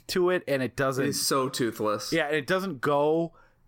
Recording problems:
none

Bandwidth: 16.5 kHz